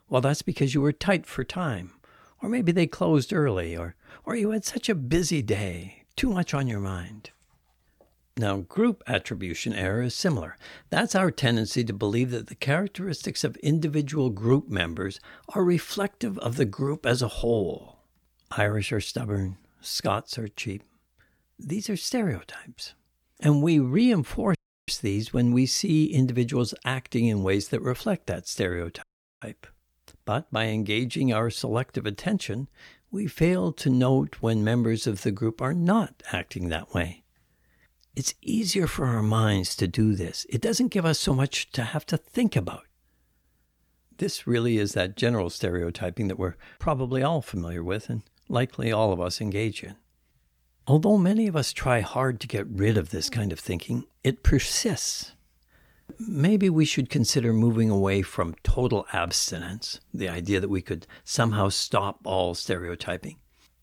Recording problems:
audio cutting out; at 25 s and at 29 s

